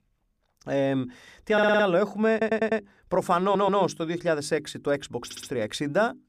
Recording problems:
audio stuttering; 4 times, first at 1.5 s

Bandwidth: 15 kHz